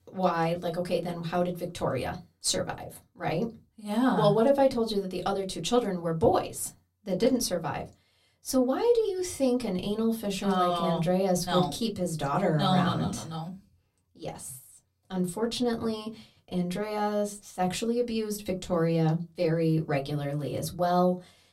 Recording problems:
room echo; very slight; dies away in 0.2 s
off-mic speech; somewhat distant

